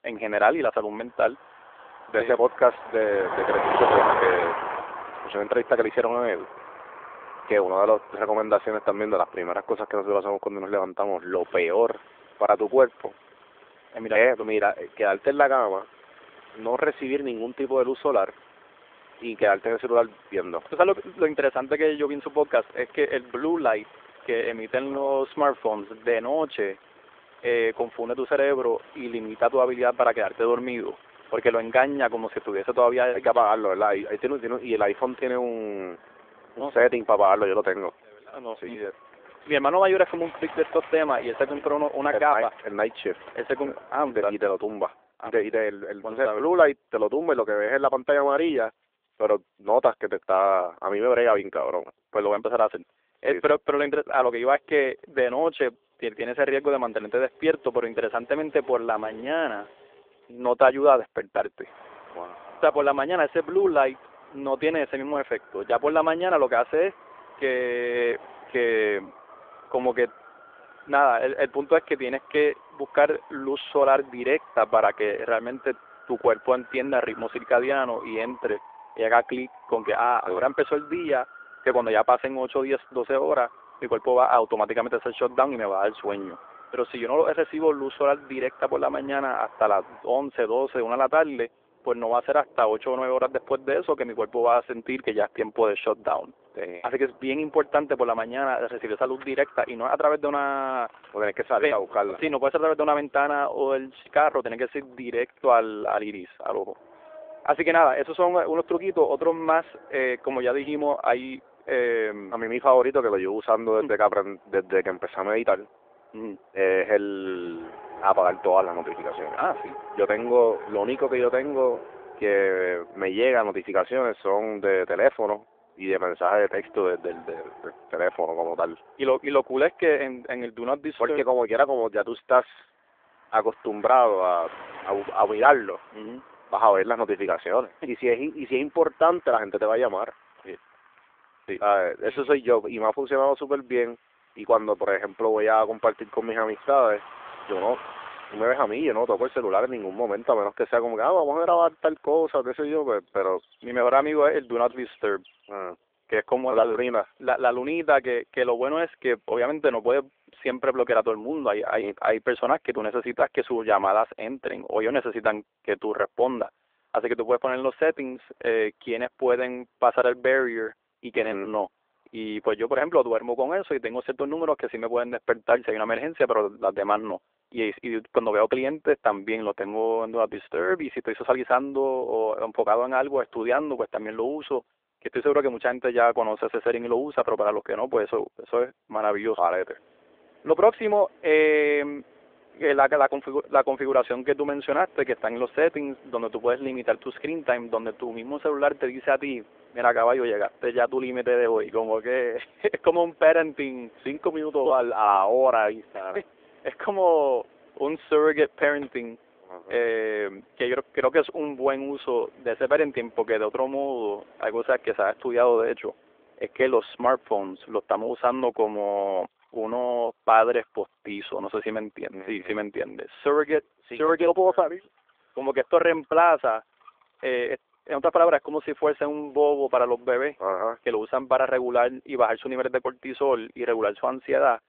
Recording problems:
phone-call audio; nothing above 3.5 kHz
traffic noise; noticeable; throughout; 15 dB below the speech

